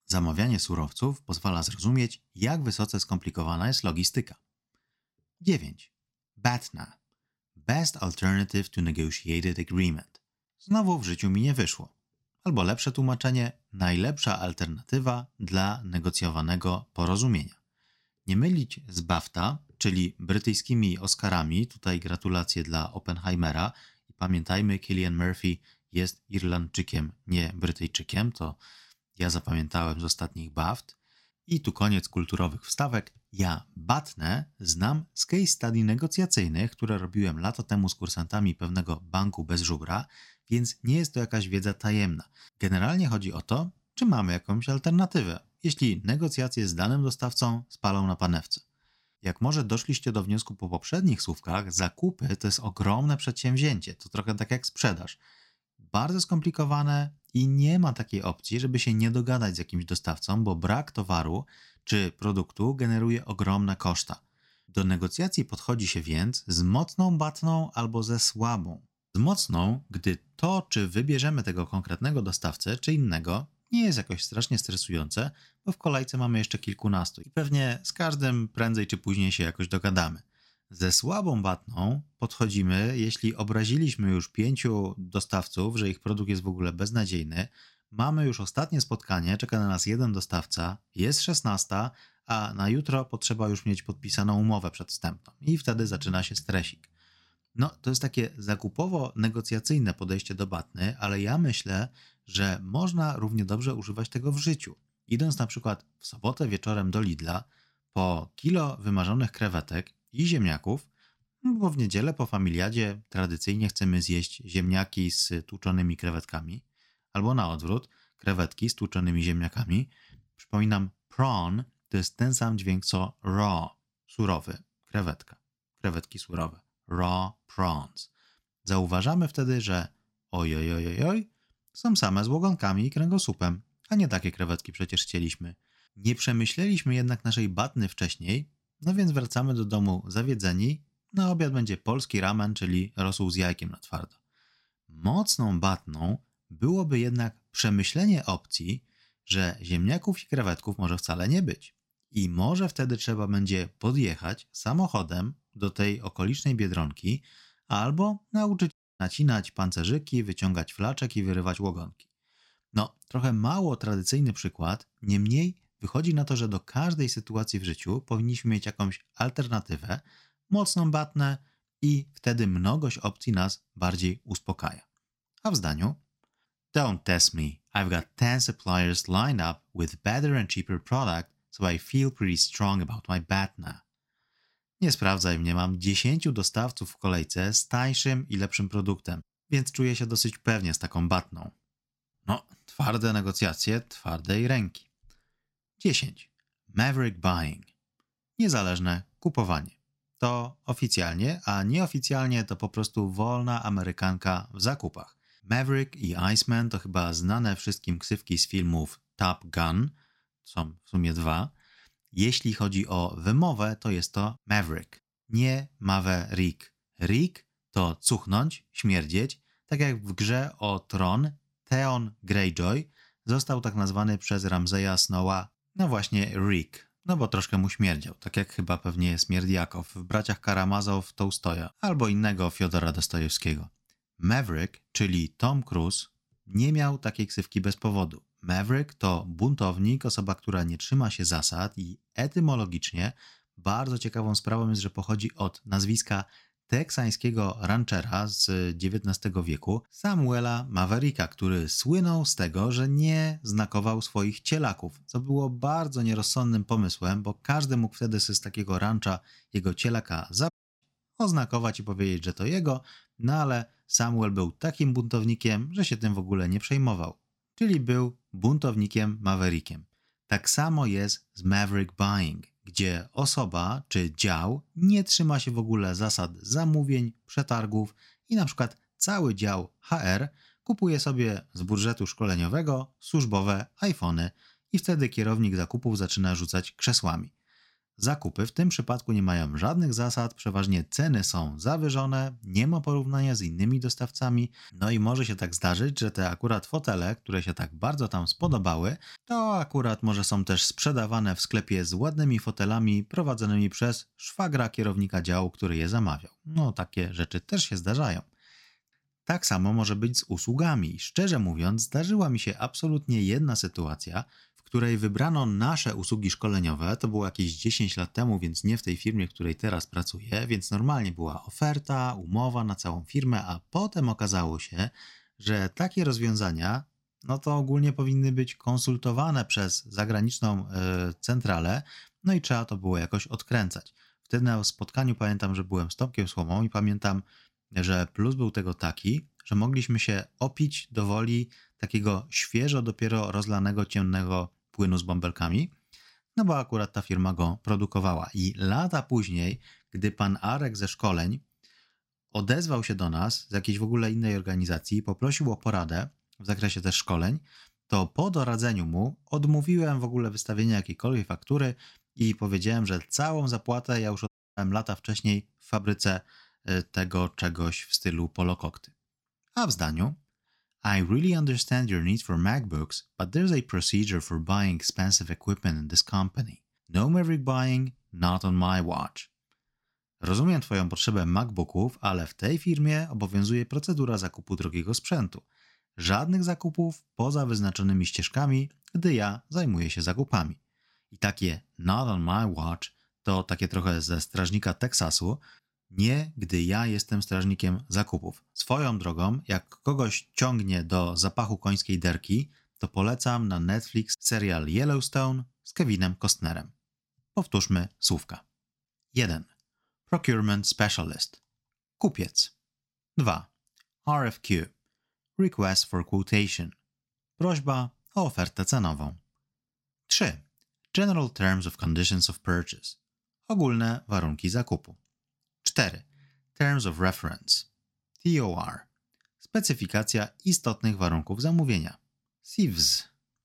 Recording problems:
audio cutting out; at 2:39, at 4:21 and at 6:04

